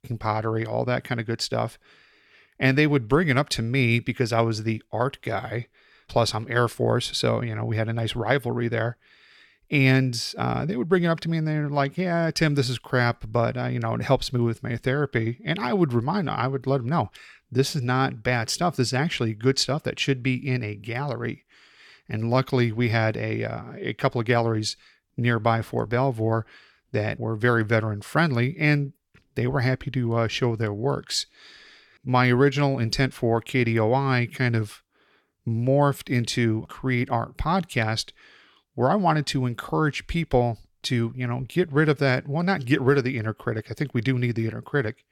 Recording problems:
none

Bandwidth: 17 kHz